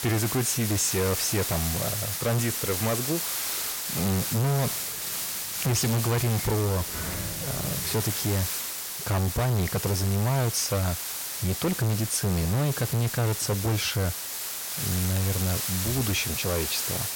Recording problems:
distortion; heavy; 22% of the sound clipped
hiss; loud; throughout; 2 dB below the speech
door banging; noticeable; from 4.5 to 8 s; peak 8 dB below the speech

